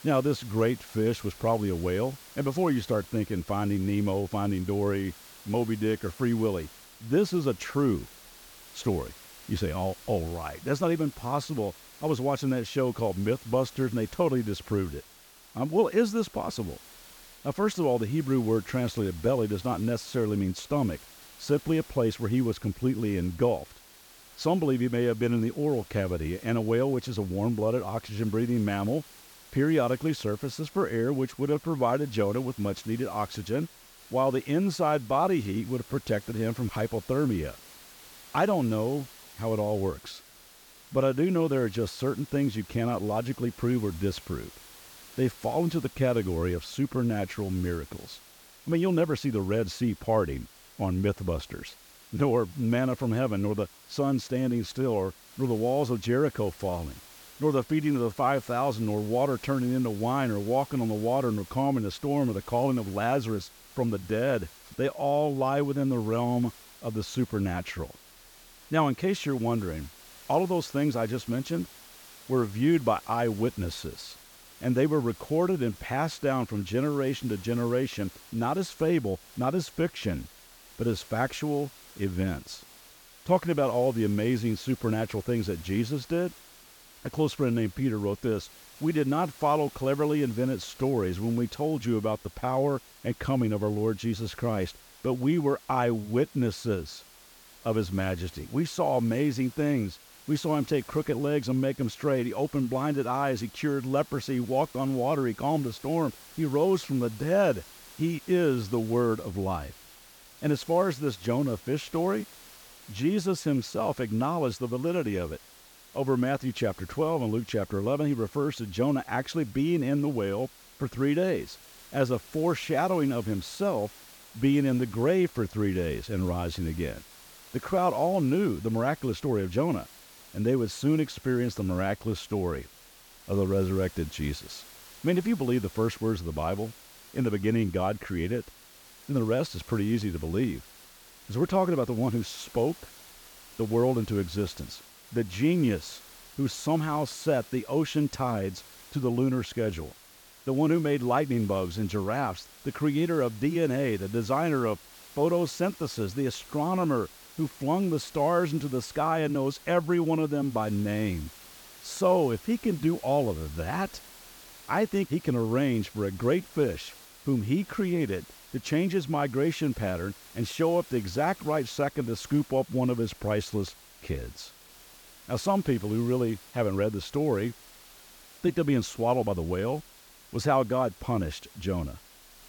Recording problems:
hiss; faint; throughout; 20 dB below the speech

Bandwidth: 18 kHz